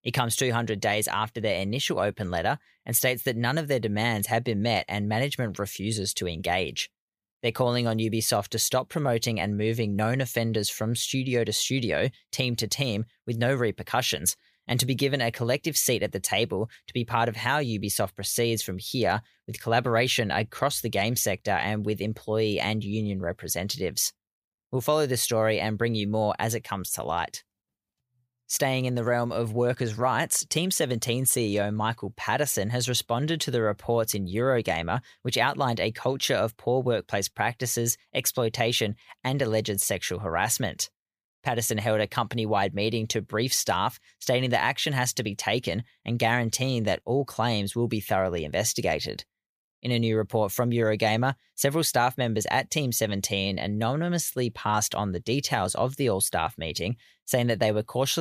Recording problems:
abrupt cut into speech; at the end

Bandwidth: 15 kHz